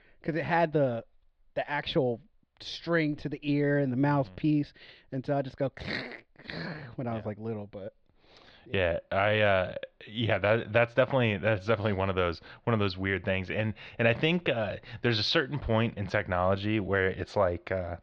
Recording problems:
muffled; slightly; fading above 4.5 kHz

